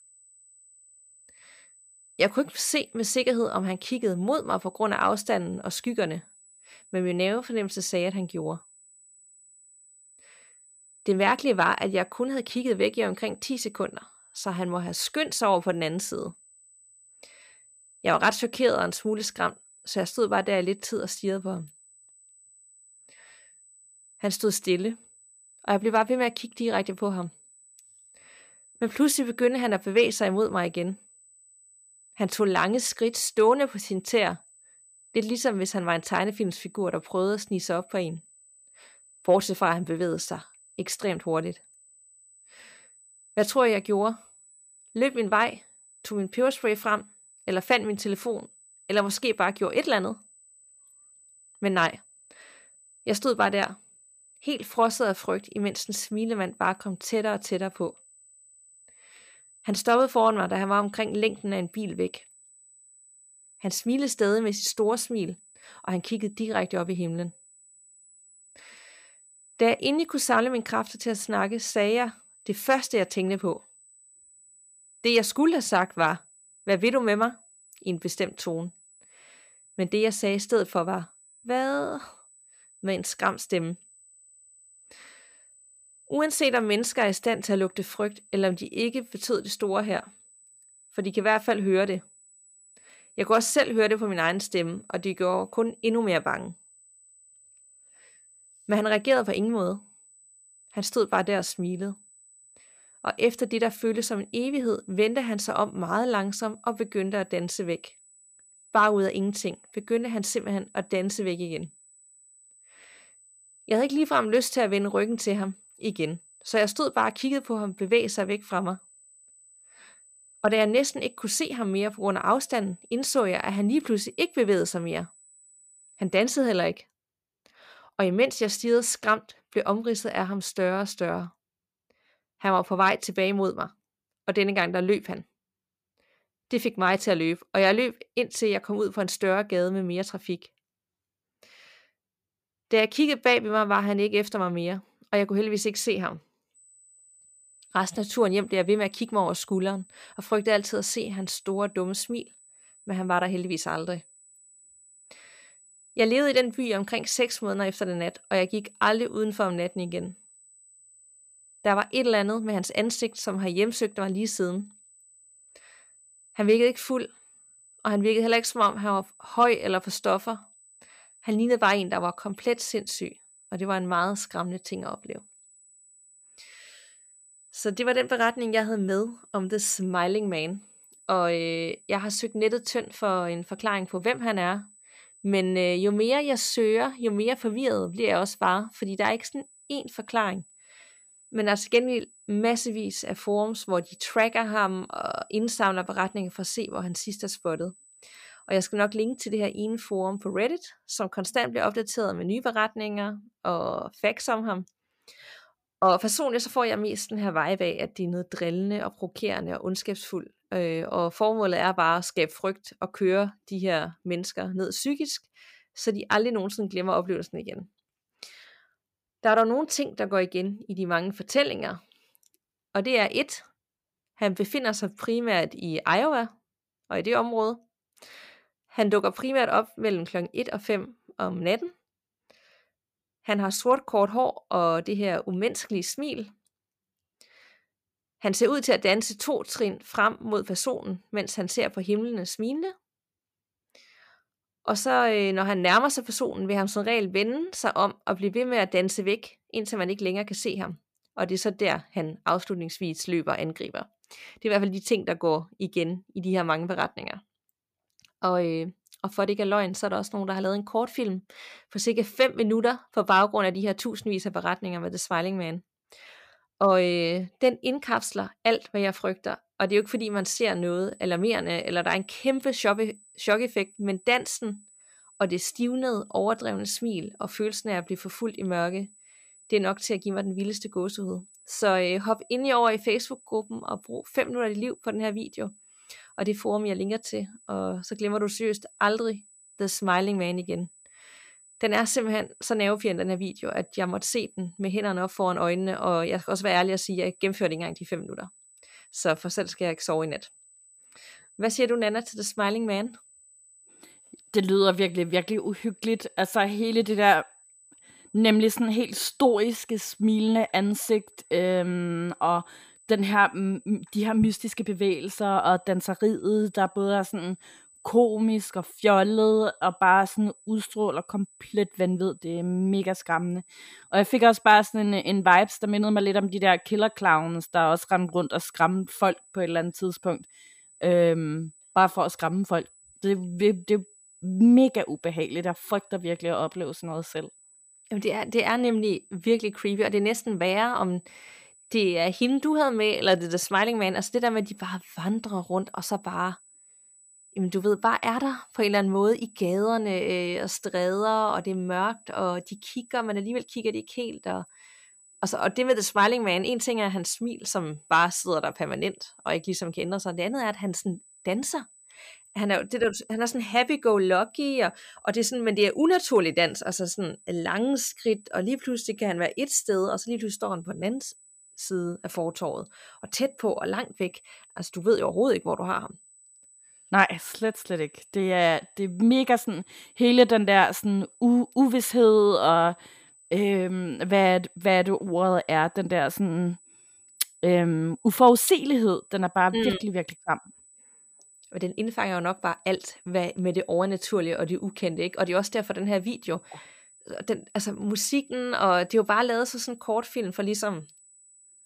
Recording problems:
high-pitched whine; faint; until 2:06, from 2:27 to 3:20 and from 4:30 on; 8 kHz, 25 dB below the speech

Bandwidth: 15 kHz